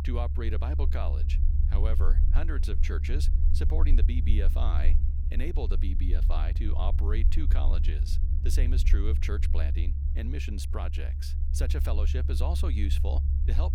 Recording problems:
low rumble; loud; throughout; 6 dB below the speech

